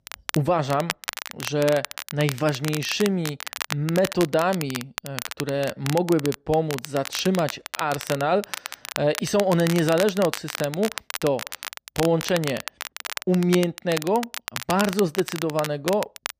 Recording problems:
crackle, like an old record; loud; 9 dB below the speech

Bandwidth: 15 kHz